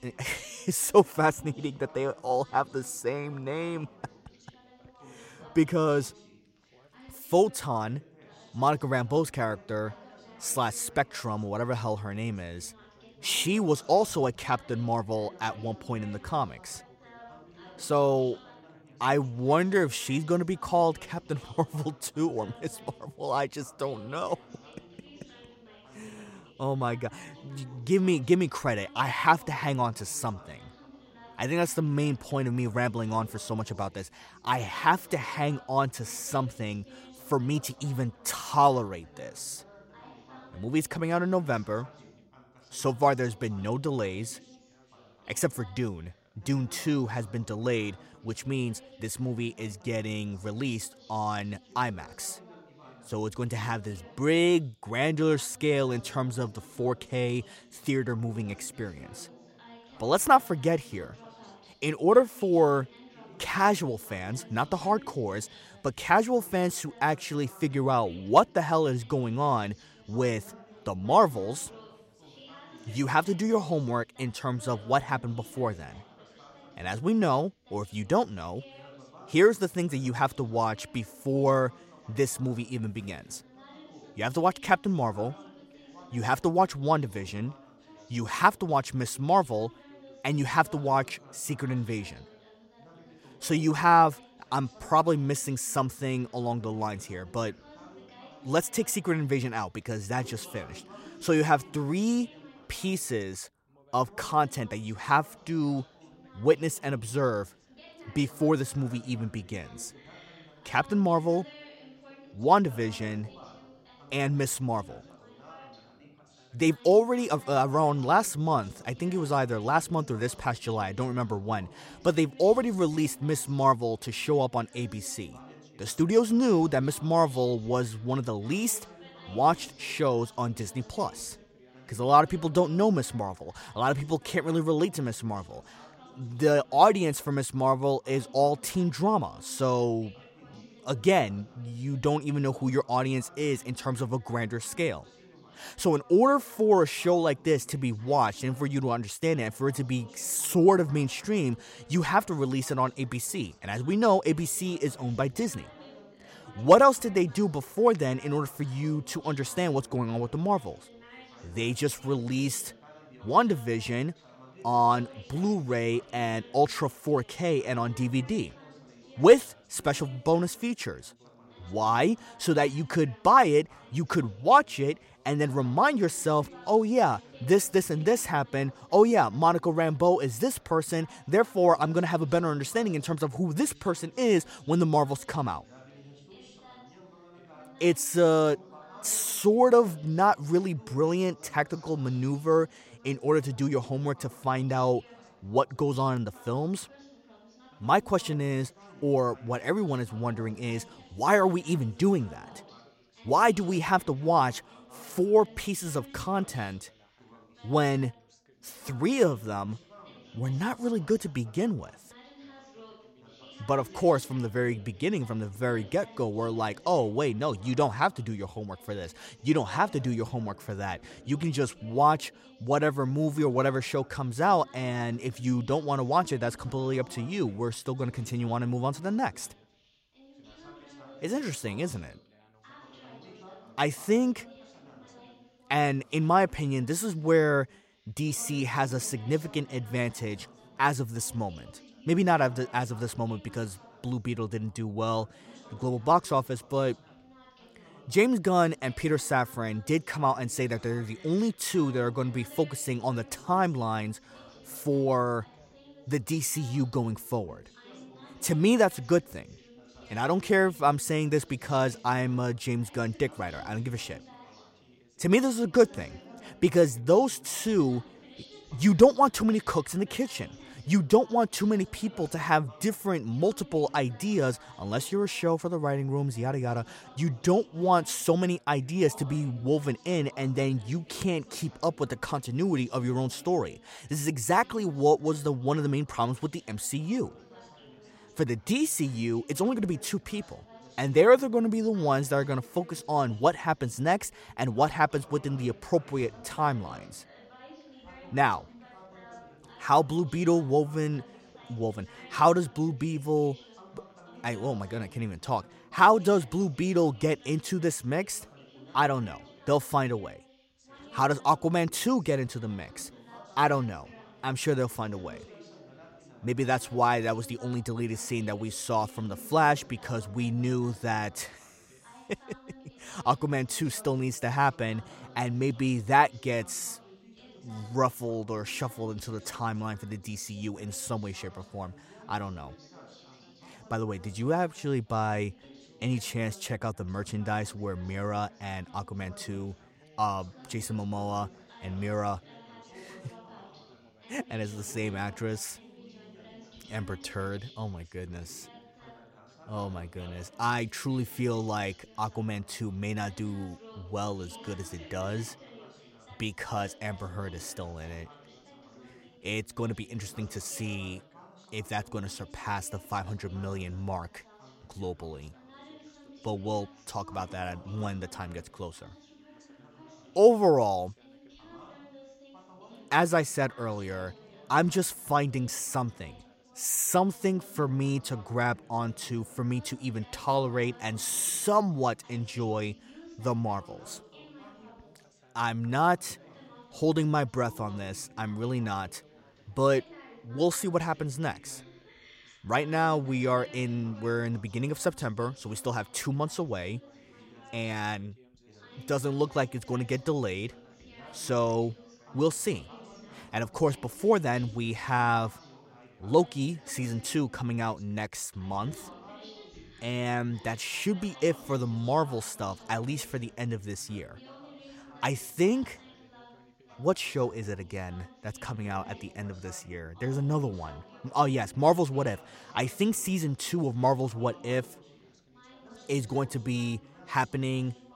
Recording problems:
background chatter; faint; throughout; 3 voices, 25 dB below the speech

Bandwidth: 16 kHz